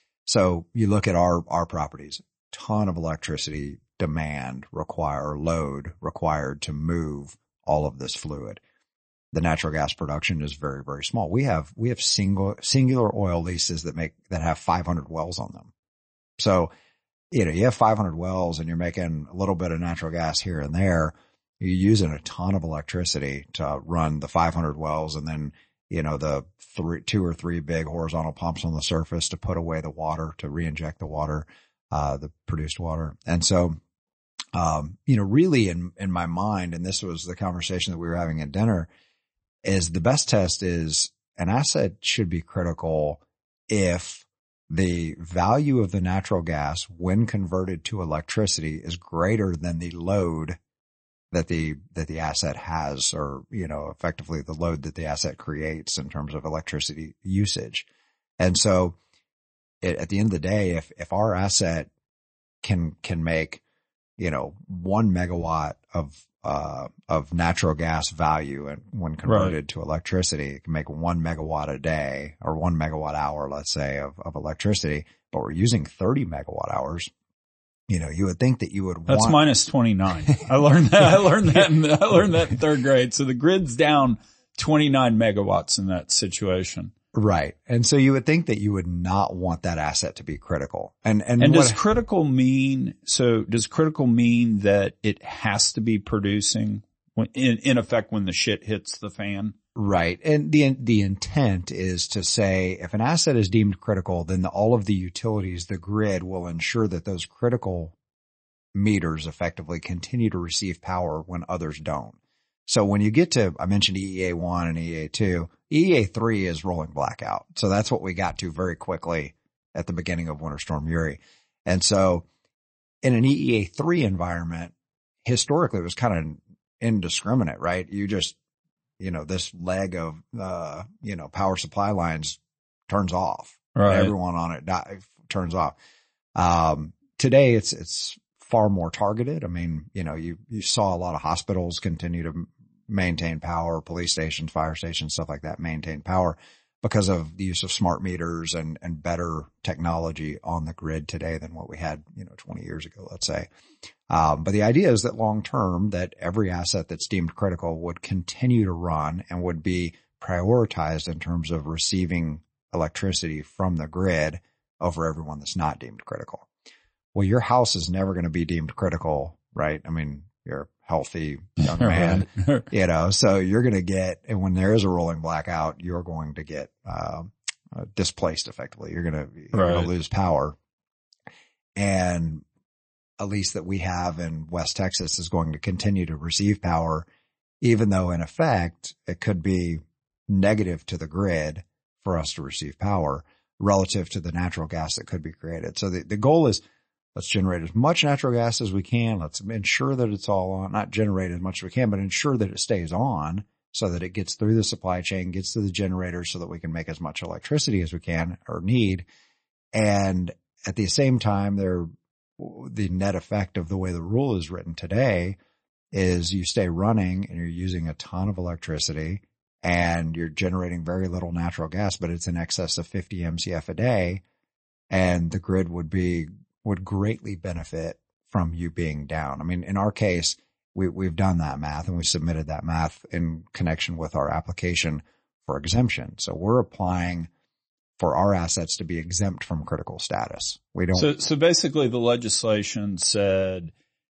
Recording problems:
garbled, watery; slightly; nothing above 8 kHz

